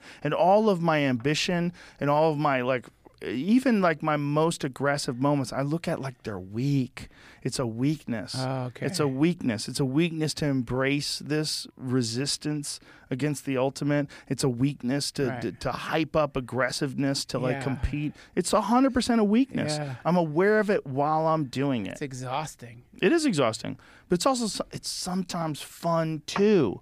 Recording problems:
none

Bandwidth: 15 kHz